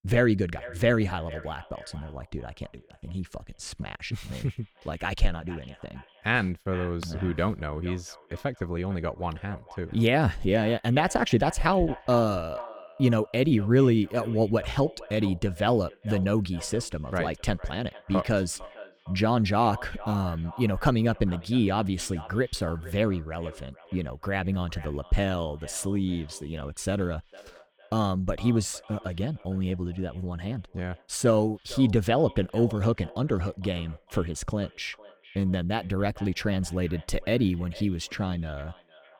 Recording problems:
echo of what is said; faint; throughout; 460 ms later, 20 dB below the speech

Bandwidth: 18 kHz